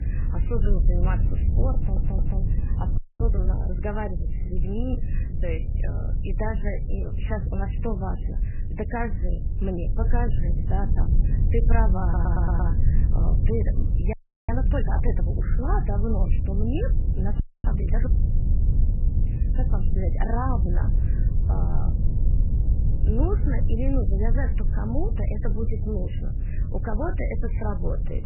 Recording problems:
garbled, watery; badly; nothing above 3 kHz
low rumble; loud; throughout; 7 dB below the speech
audio stuttering; at 2 s and at 12 s
audio freezing; at 3 s, at 14 s and at 17 s

